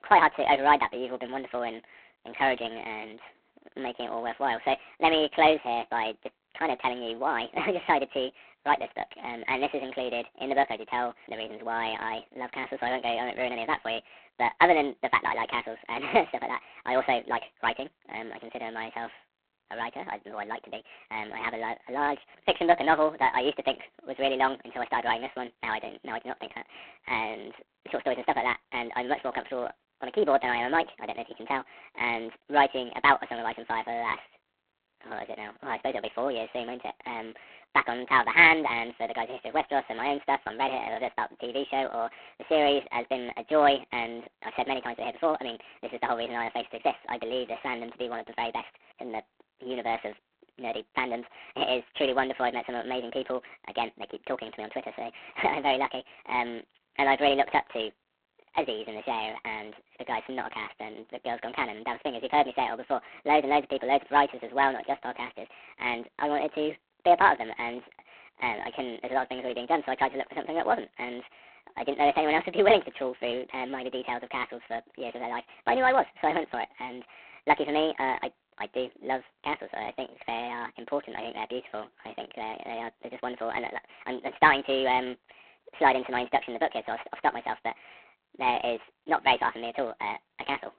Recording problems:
phone-call audio; poor line
wrong speed and pitch; too fast and too high; 1.5 times normal speed

